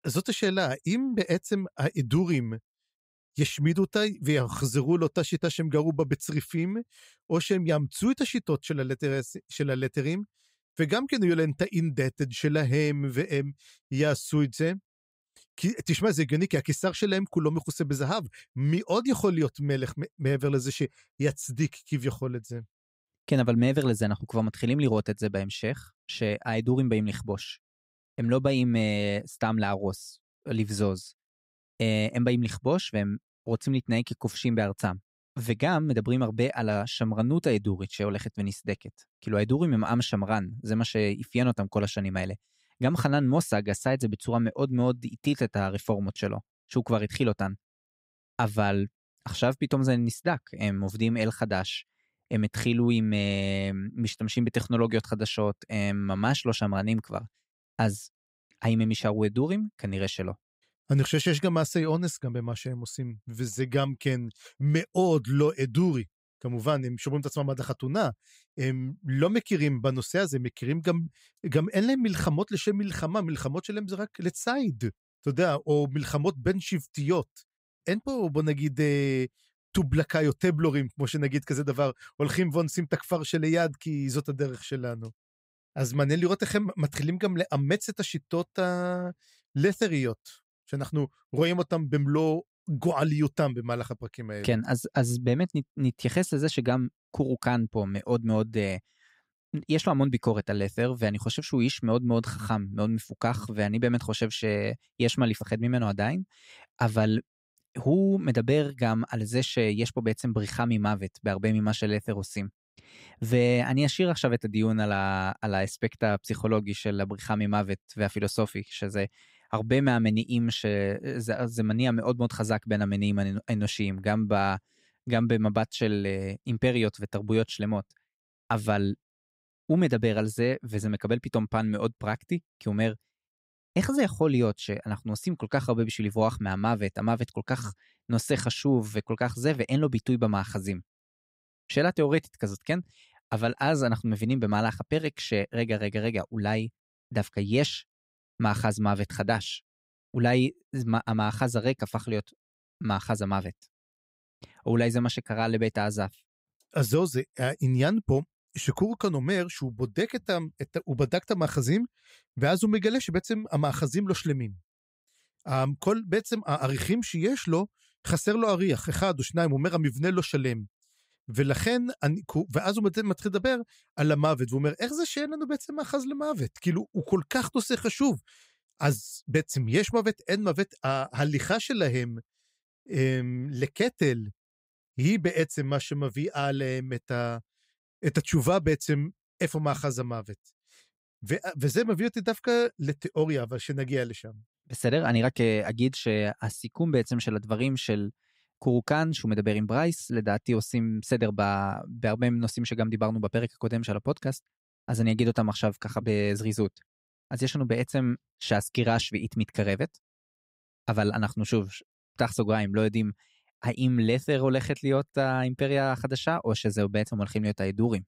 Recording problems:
none

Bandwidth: 15.5 kHz